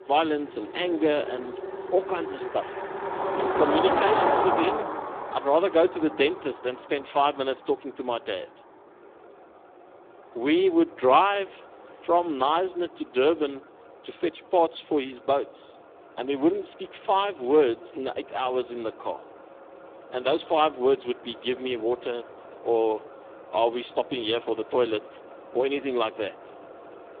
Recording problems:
phone-call audio; poor line
traffic noise; loud; throughout; 3 dB below the speech

